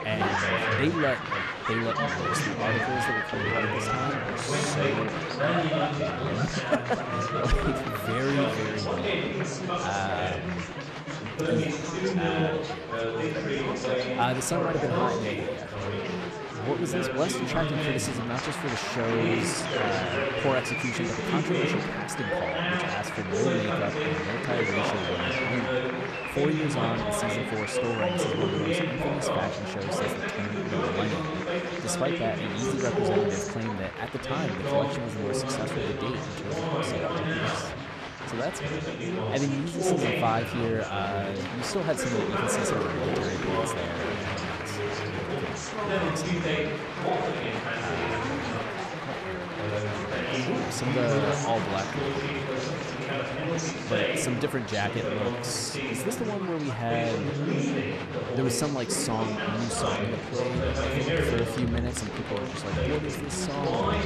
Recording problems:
chatter from many people; very loud; throughout; 3 dB above the speech

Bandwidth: 13.5 kHz